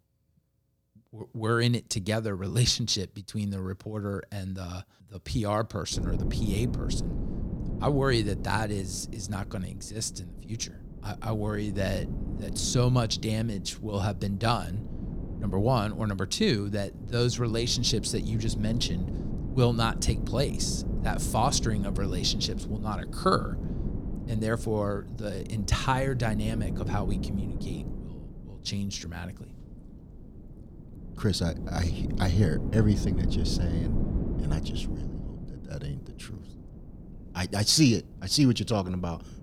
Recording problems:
wind noise on the microphone; occasional gusts; from 6 s on; 15 dB below the speech

